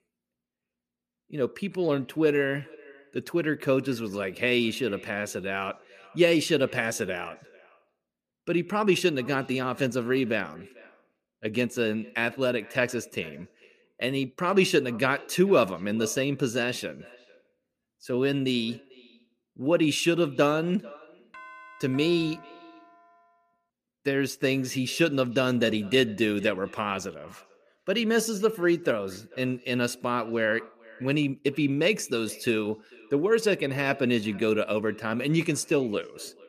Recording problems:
echo of what is said; faint; throughout; 440 ms later, 25 dB below the speech
doorbell; faint; from 21 to 23 s; peak 20 dB below the speech

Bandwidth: 14.5 kHz